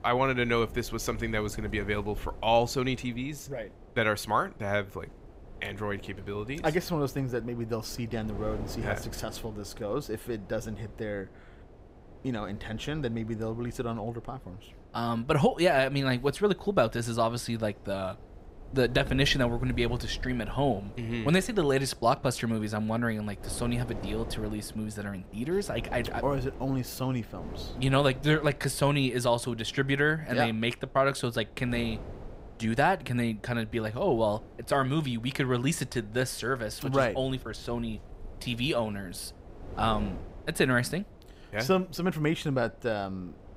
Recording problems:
wind noise on the microphone; occasional gusts; 20 dB below the speech

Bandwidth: 15.5 kHz